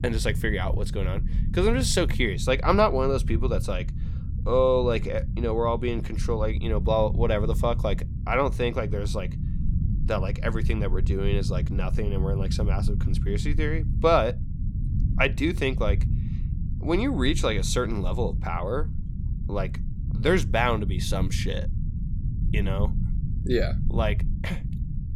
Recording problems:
low rumble; noticeable; throughout; 15 dB below the speech

